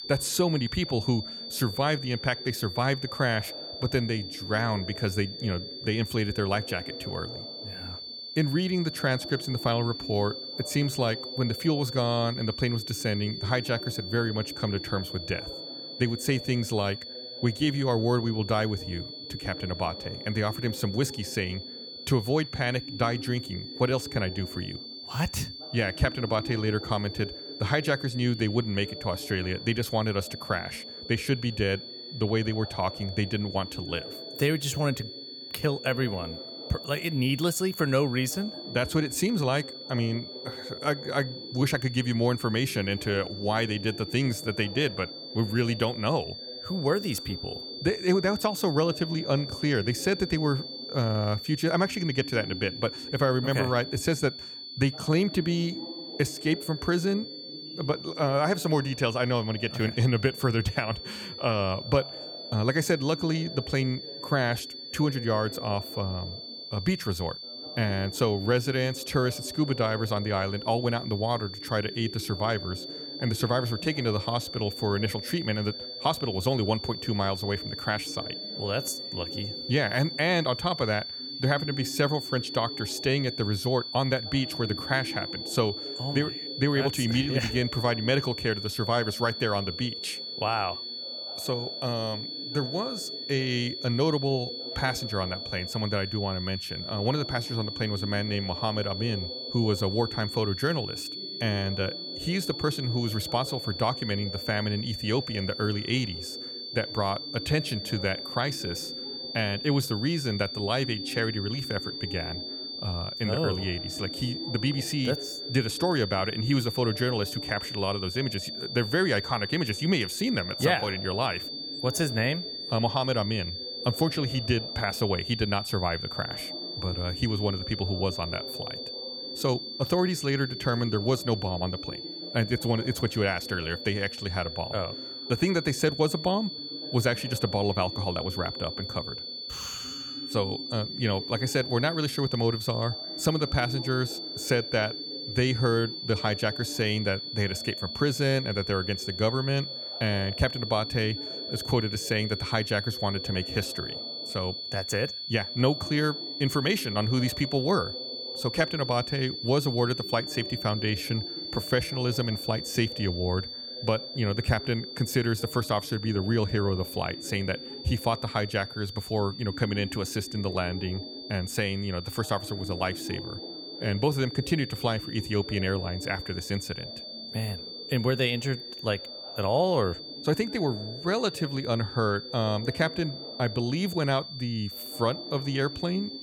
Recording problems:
high-pitched whine; loud; throughout; 4.5 kHz, 7 dB below the speech
voice in the background; noticeable; throughout; 15 dB below the speech

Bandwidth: 17.5 kHz